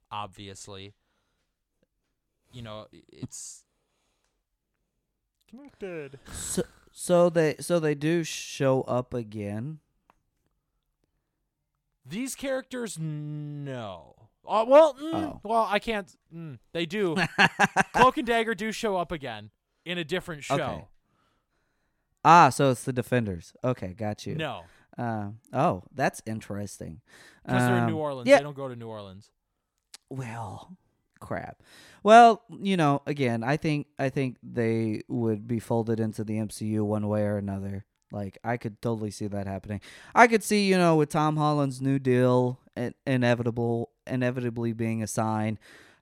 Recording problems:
none

